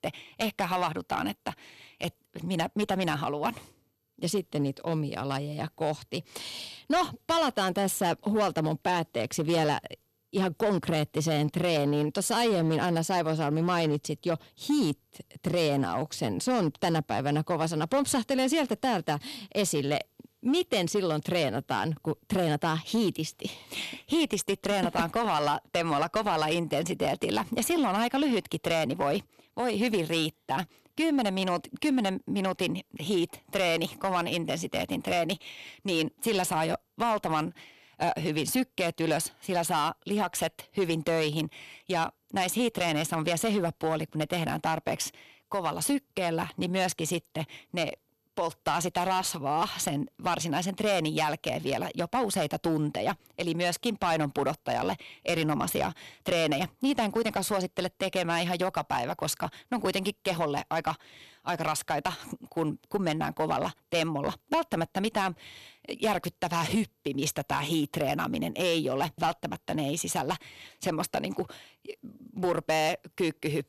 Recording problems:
distortion; slight; 5% of the sound clipped

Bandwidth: 13.5 kHz